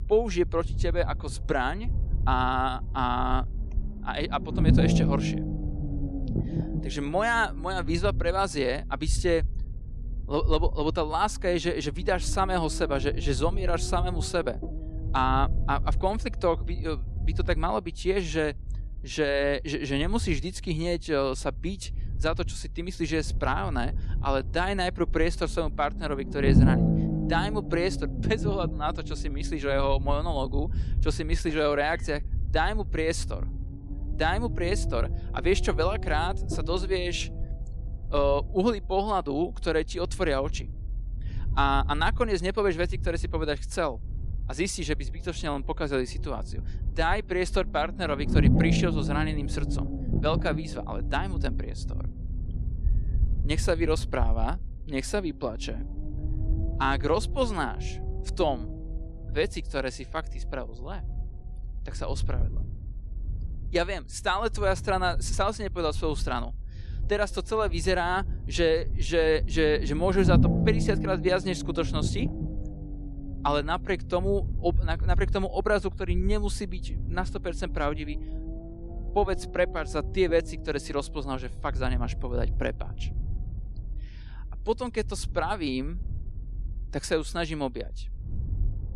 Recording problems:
low rumble; noticeable; throughout; 15 dB below the speech

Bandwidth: 13 kHz